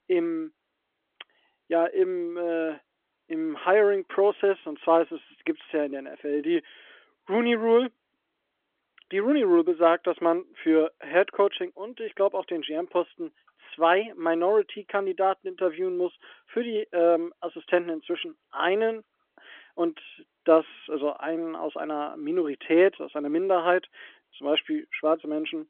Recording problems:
phone-call audio; nothing above 3.5 kHz

